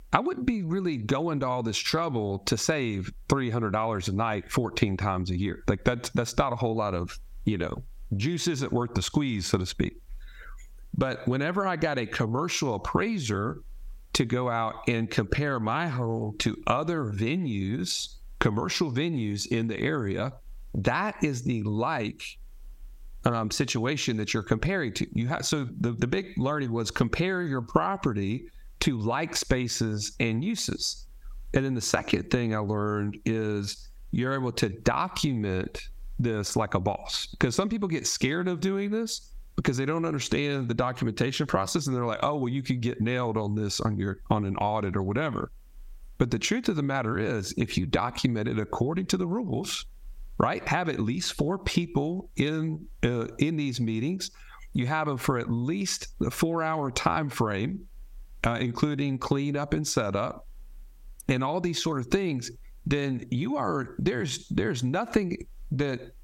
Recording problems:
squashed, flat; heavily

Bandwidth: 16 kHz